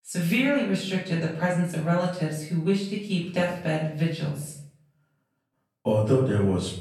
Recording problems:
off-mic speech; far
room echo; noticeable; dies away in 0.5 s

